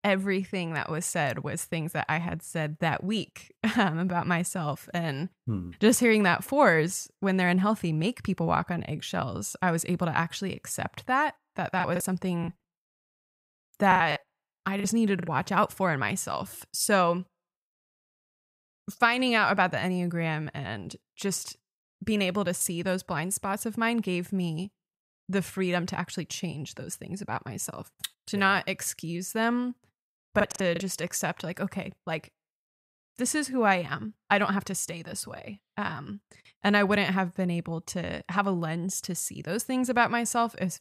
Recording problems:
choppy; very; from 12 to 15 s and at 30 s; 15% of the speech affected

